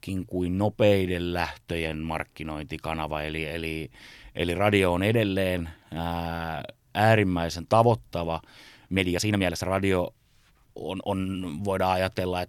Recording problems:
uneven, jittery; strongly; from 1 to 11 s

